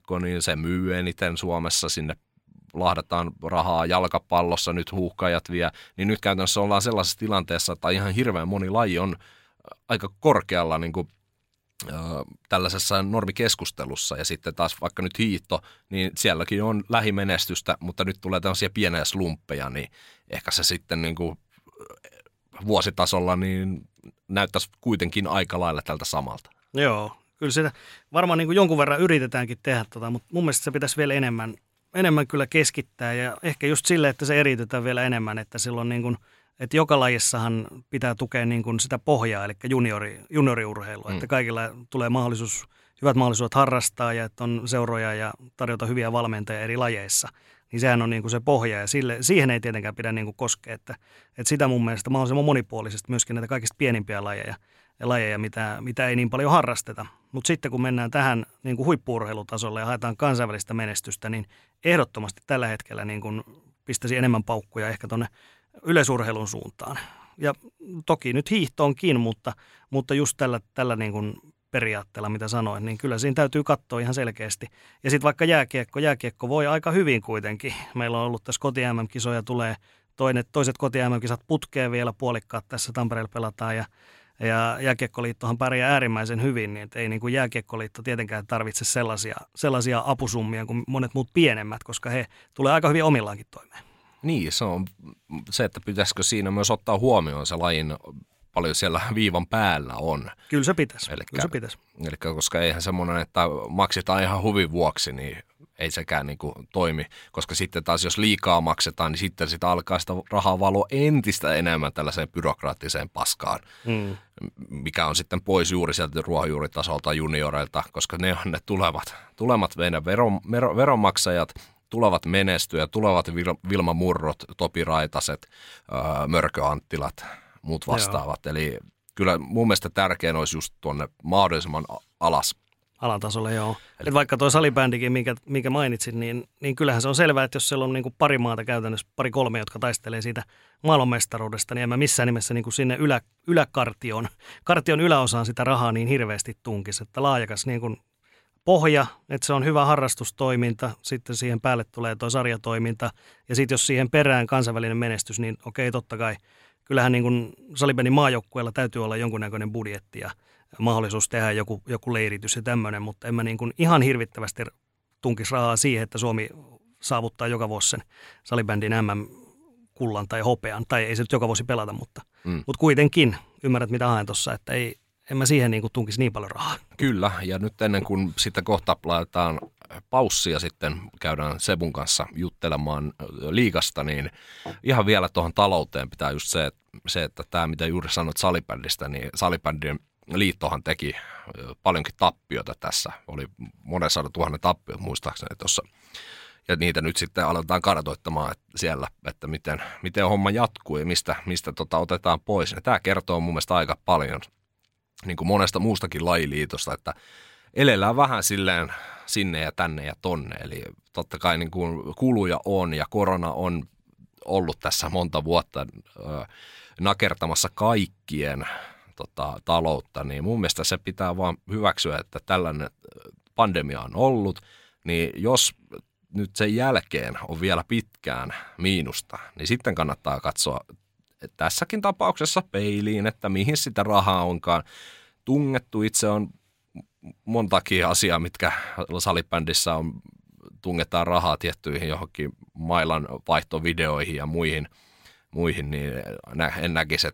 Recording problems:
none

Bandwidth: 16 kHz